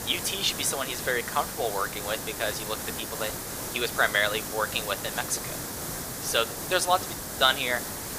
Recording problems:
thin; very; fading below 650 Hz
hiss; loud; throughout; 5 dB below the speech
train or aircraft noise; faint; throughout; 25 dB below the speech

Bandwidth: 15 kHz